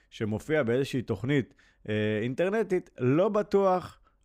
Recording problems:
none

